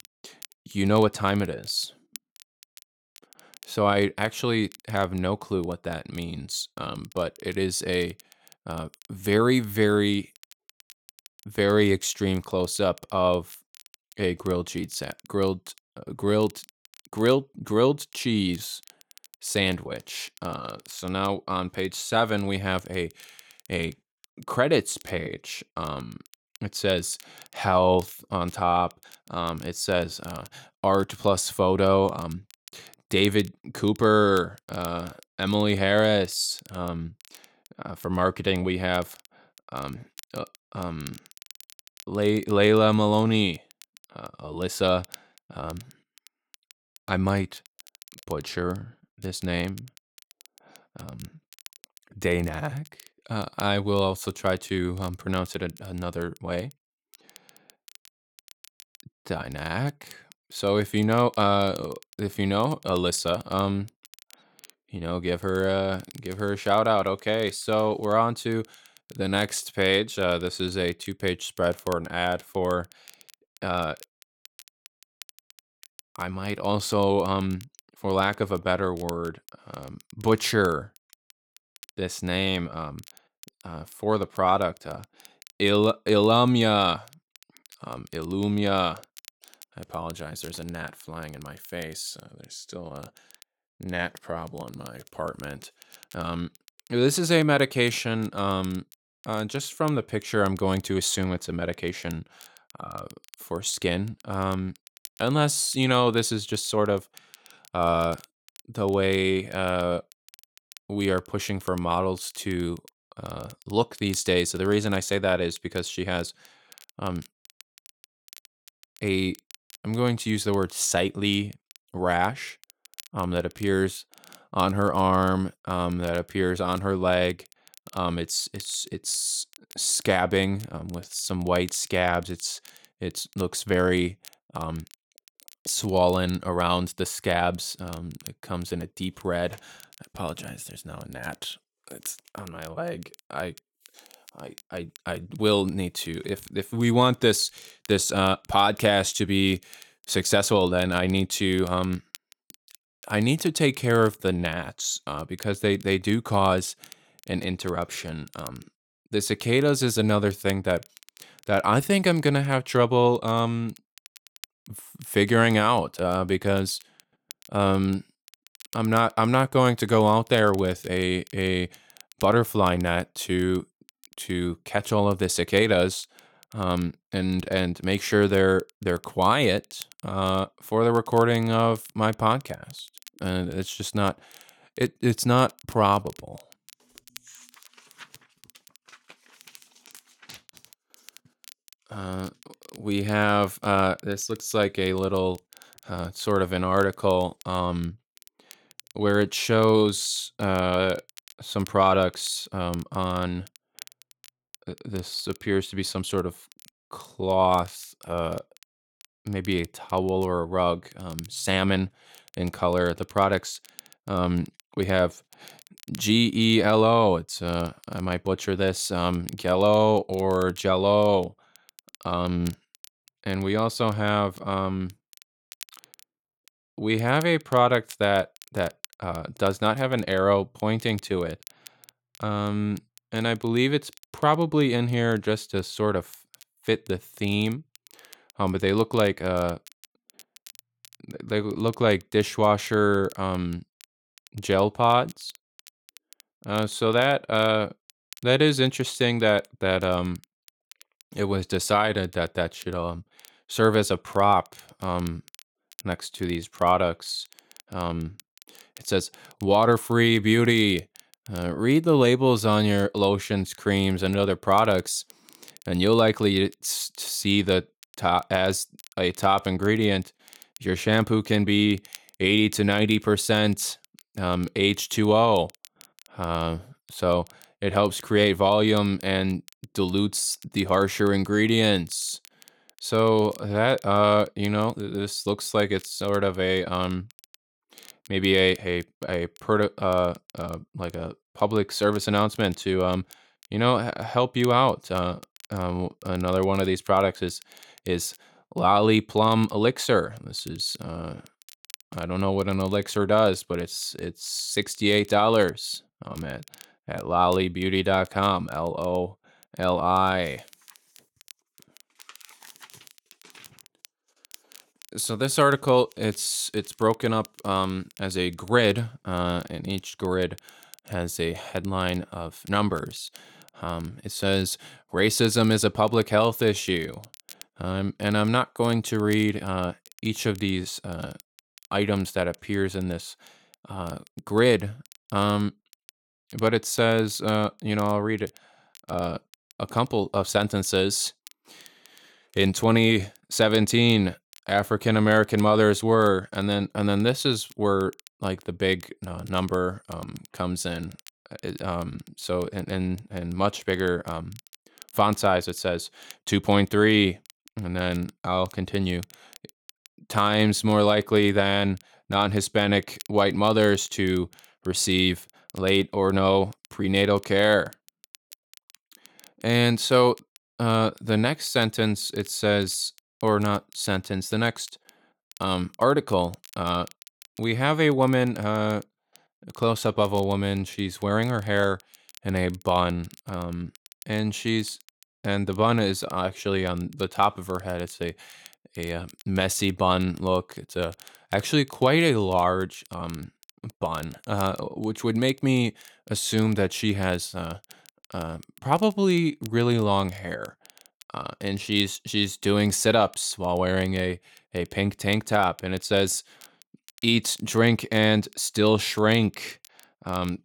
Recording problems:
crackle, like an old record; faint; 25 dB below the speech

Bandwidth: 17.5 kHz